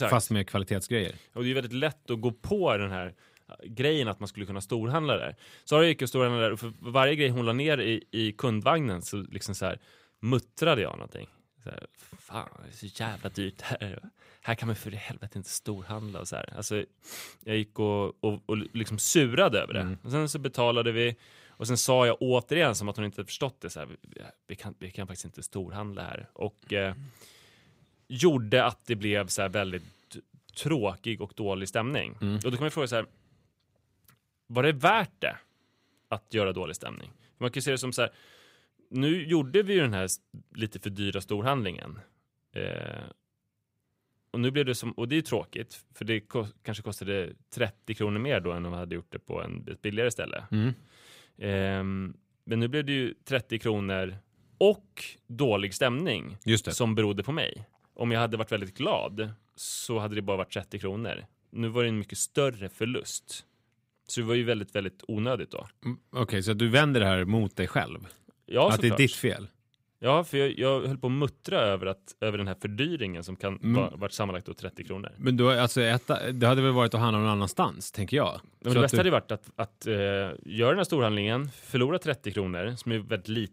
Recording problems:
abrupt cut into speech; at the start

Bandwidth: 15.5 kHz